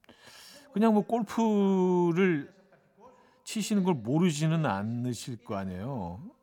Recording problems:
voice in the background; faint; throughout; 30 dB below the speech

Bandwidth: 18 kHz